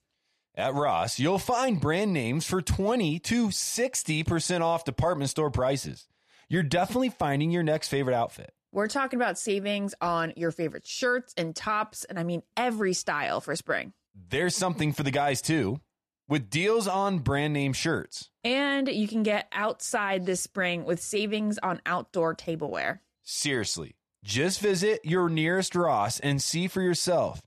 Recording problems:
none

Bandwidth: 13.5 kHz